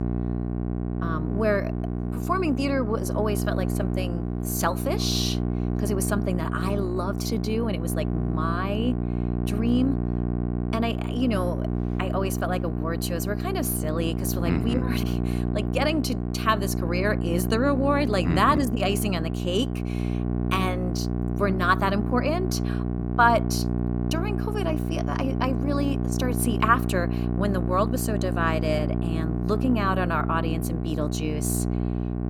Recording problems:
electrical hum; loud; throughout; 60 Hz, 8 dB below the speech

